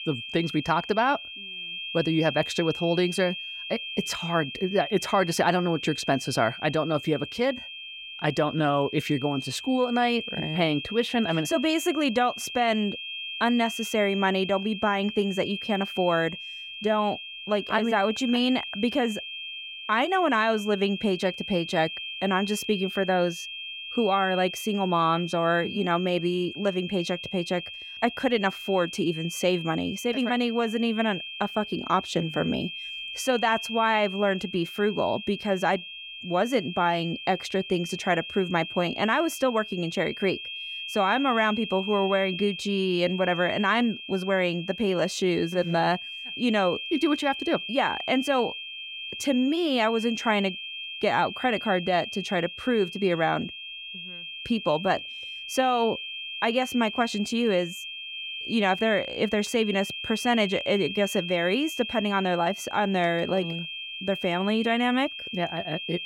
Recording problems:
high-pitched whine; loud; throughout; 3 kHz, 8 dB below the speech

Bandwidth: 16.5 kHz